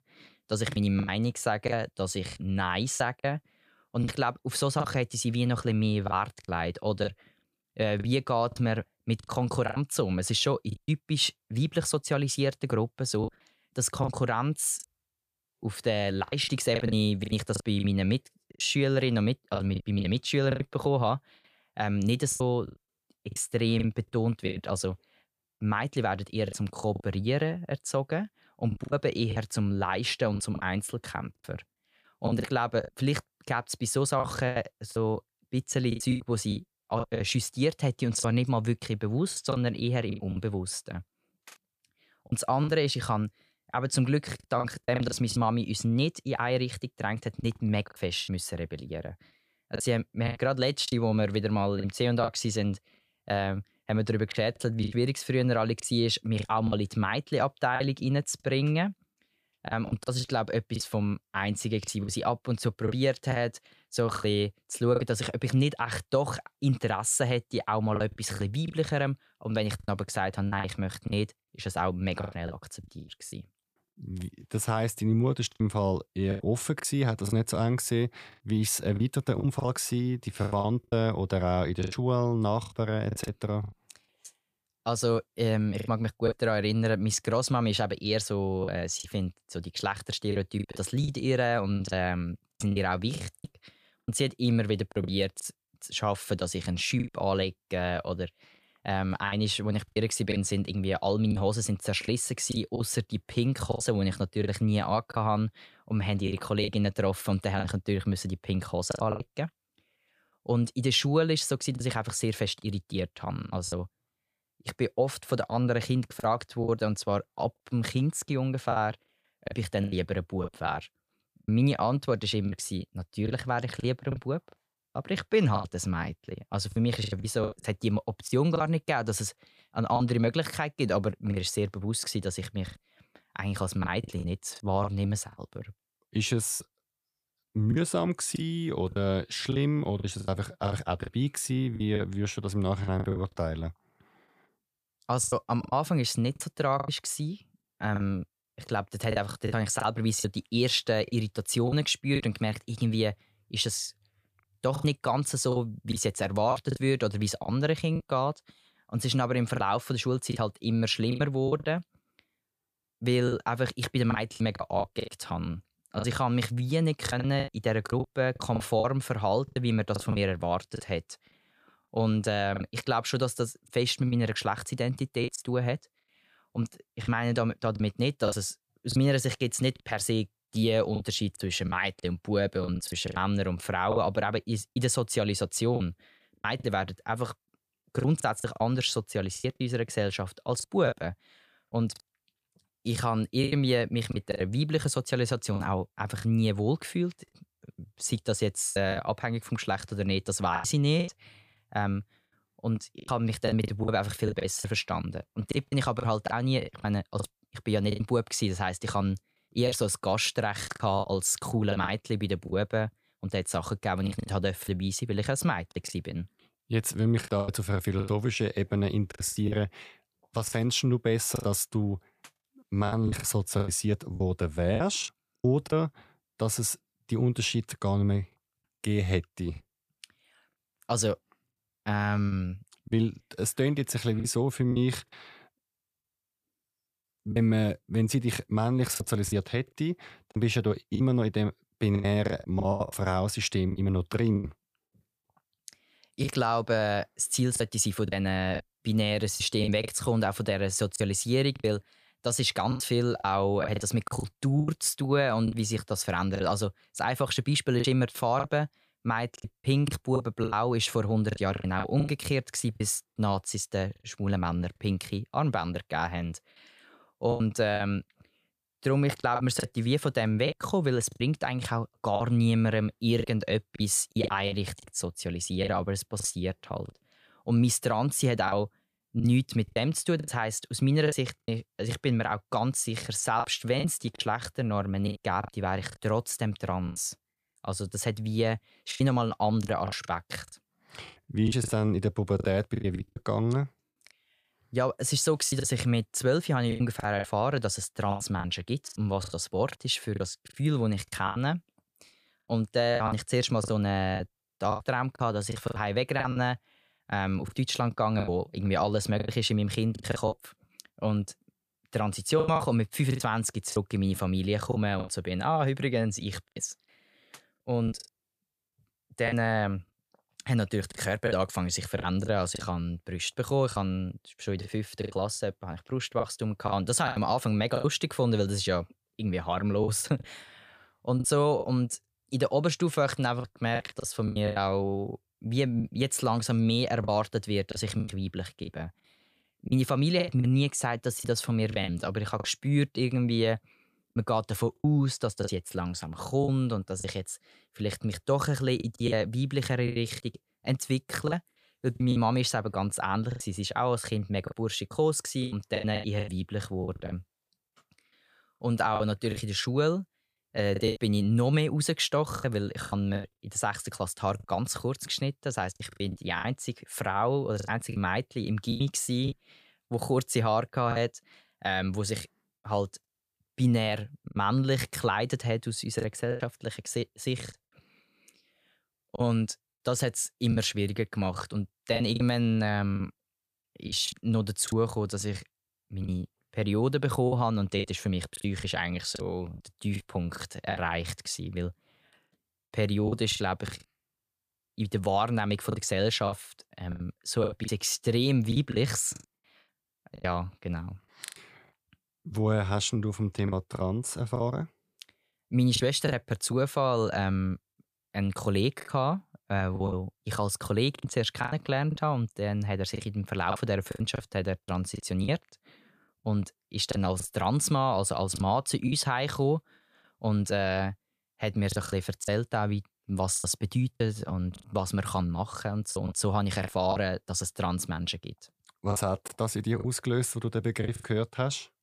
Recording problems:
choppy; very; 8% of the speech affected

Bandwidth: 15 kHz